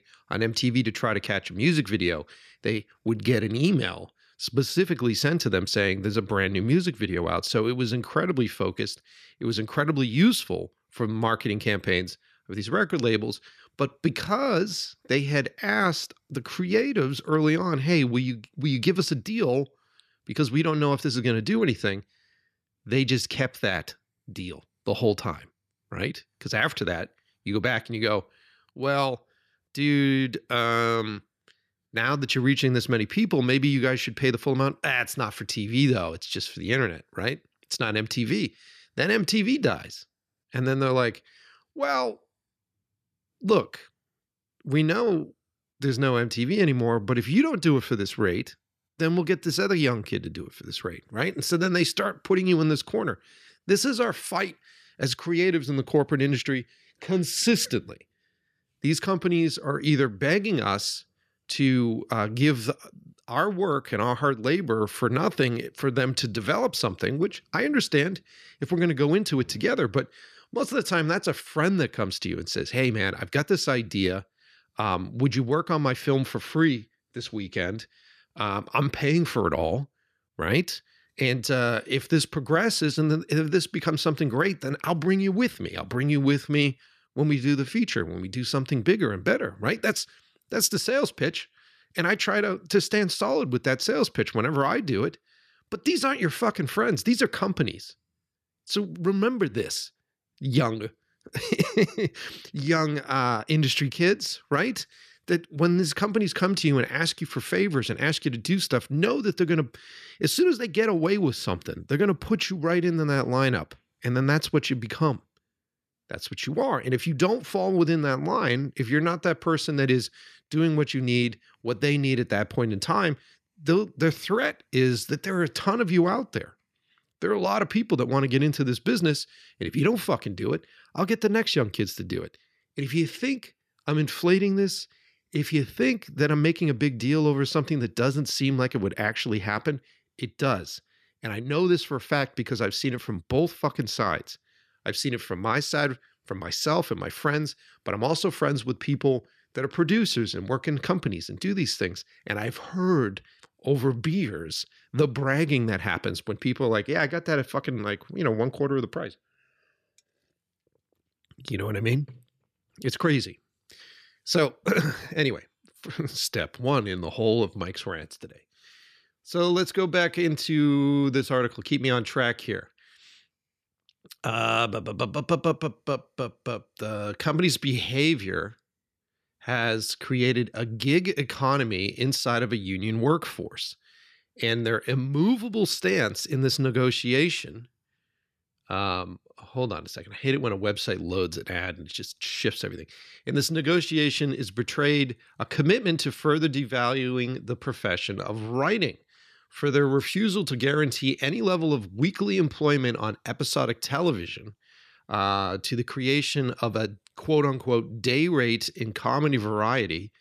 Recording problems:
none

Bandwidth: 14.5 kHz